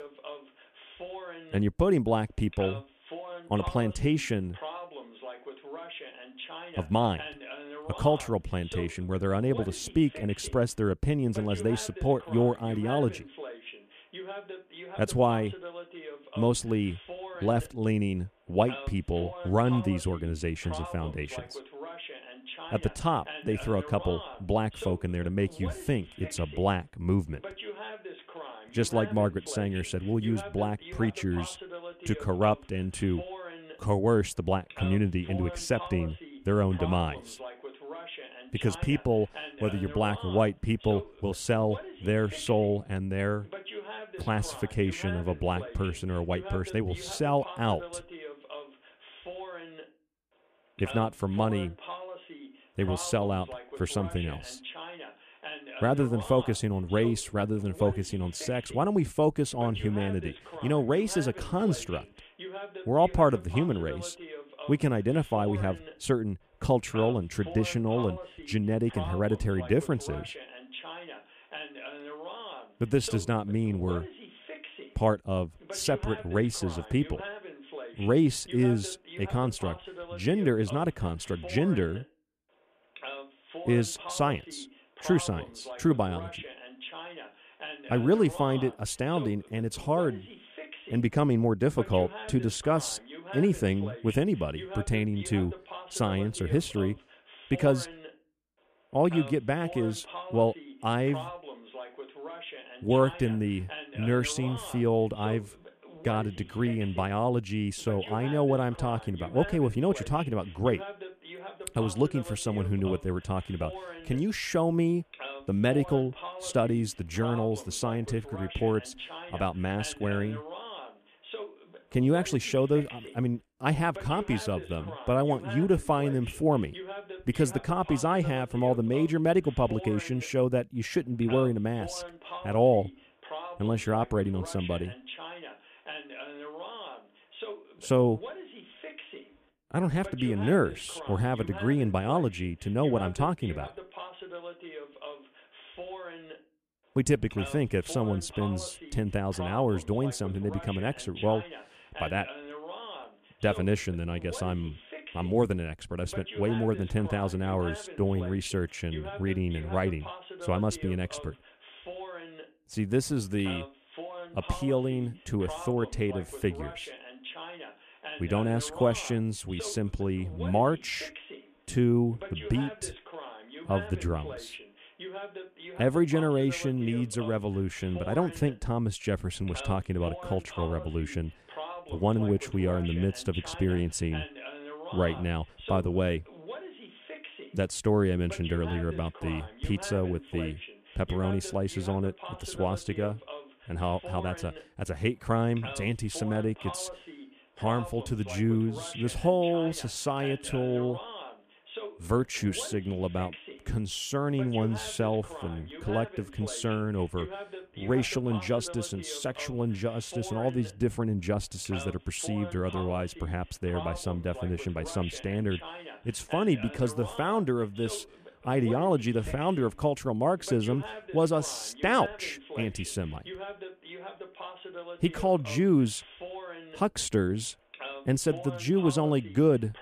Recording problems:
voice in the background; noticeable; throughout; 15 dB below the speech

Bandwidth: 14.5 kHz